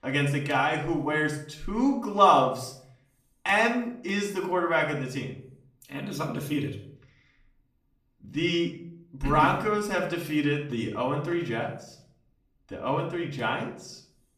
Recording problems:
off-mic speech; far
room echo; slight; dies away in 0.5 s

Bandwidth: 14.5 kHz